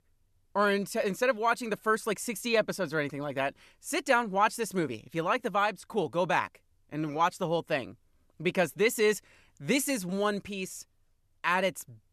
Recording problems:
none

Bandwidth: 13.5 kHz